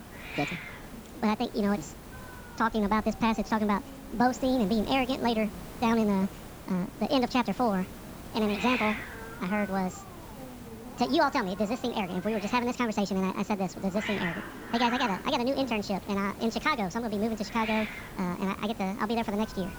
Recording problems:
wrong speed and pitch; too fast and too high; 1.6 times normal speed
high frequencies cut off; noticeable; nothing above 8 kHz
hiss; noticeable; throughout; 10 dB below the speech

